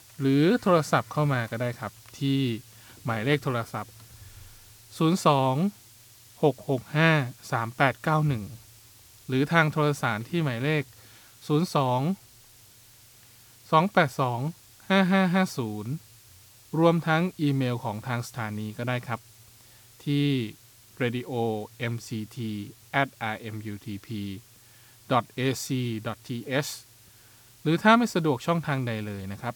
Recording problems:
hiss; faint; throughout; 25 dB below the speech

